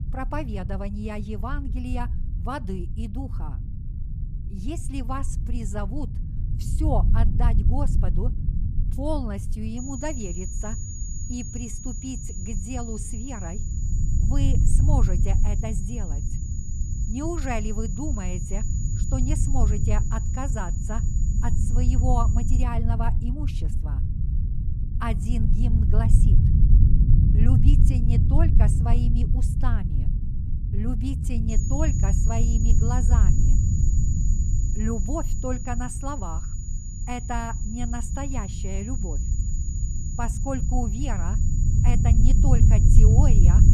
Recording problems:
high-pitched whine; loud; from 10 to 23 s and from 32 s on; 7 kHz, 7 dB below the speech
low rumble; loud; throughout; 5 dB below the speech

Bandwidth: 15 kHz